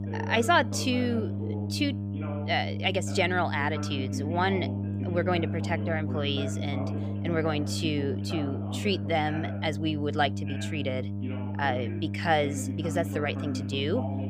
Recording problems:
electrical hum; noticeable; throughout; 50 Hz, 15 dB below the speech
voice in the background; noticeable; throughout; 10 dB below the speech

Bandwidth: 15 kHz